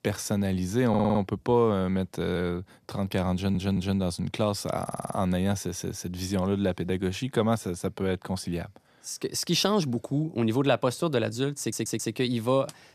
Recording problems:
audio stuttering; 4 times, first at 1 s

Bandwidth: 14 kHz